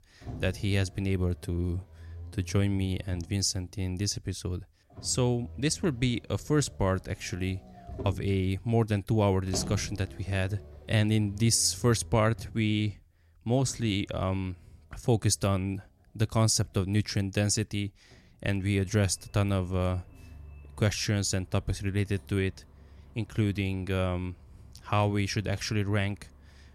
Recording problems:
traffic noise; noticeable; throughout; 20 dB below the speech

